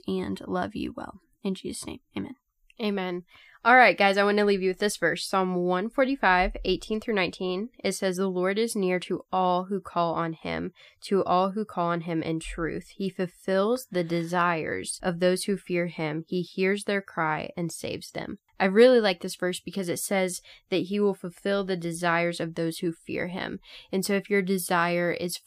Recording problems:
none

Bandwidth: 15 kHz